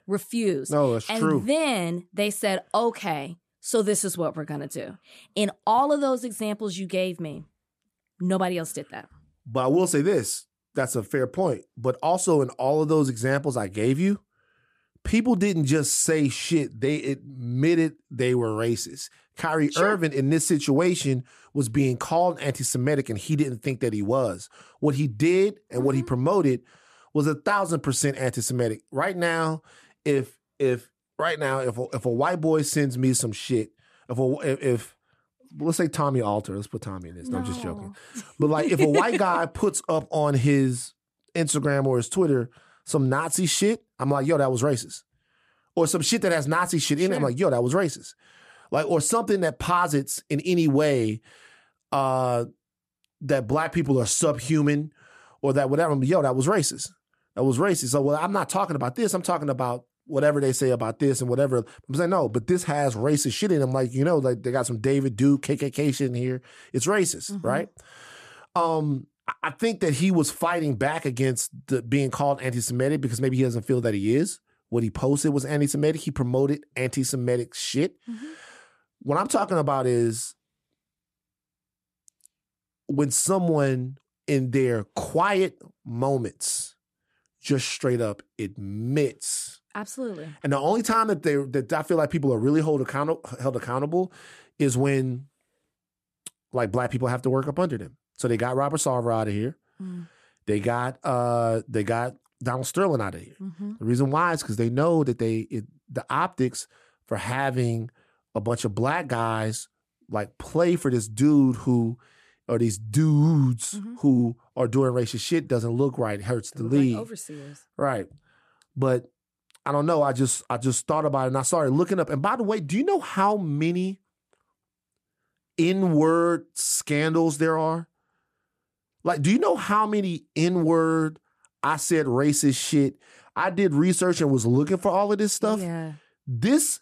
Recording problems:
none

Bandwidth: 14.5 kHz